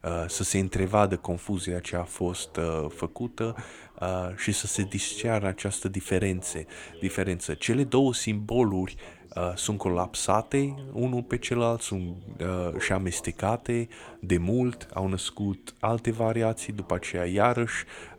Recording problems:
background chatter; faint; throughout; 2 voices, 20 dB below the speech

